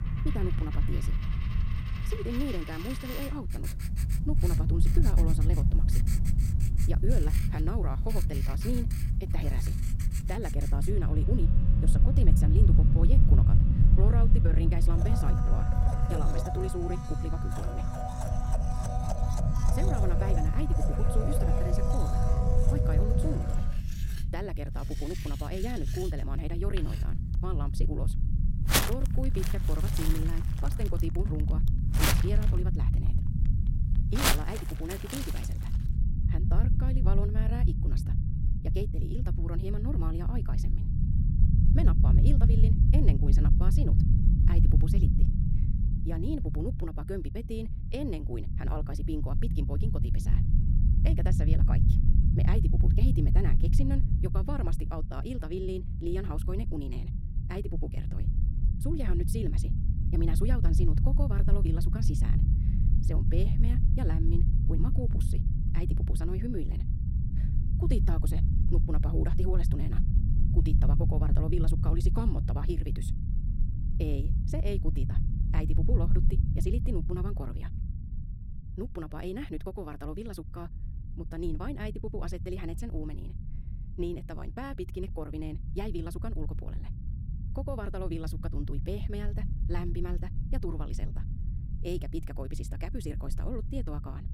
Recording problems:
wrong speed, natural pitch; too fast; 1.6 times normal speed
household noises; very loud; until 36 s; as loud as the speech
low rumble; loud; throughout; 3 dB below the speech

